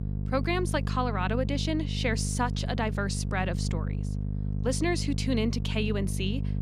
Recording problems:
electrical hum; noticeable; throughout; 50 Hz, 10 dB below the speech

